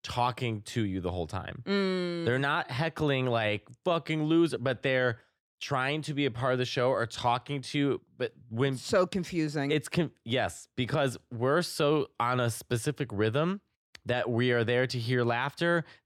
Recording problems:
none

